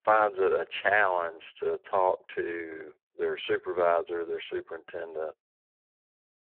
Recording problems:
phone-call audio; poor line

